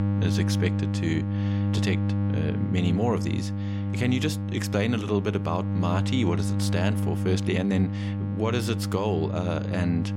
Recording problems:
electrical hum; loud; throughout; 50 Hz, 6 dB below the speech

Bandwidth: 16.5 kHz